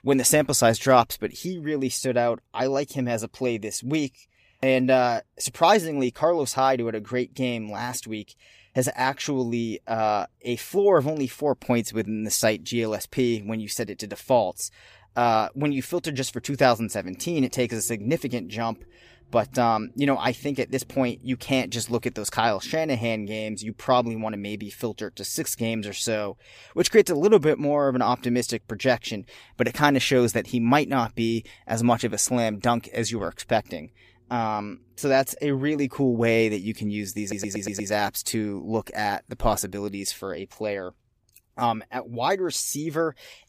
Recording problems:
audio stuttering; at 37 s

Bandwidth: 15 kHz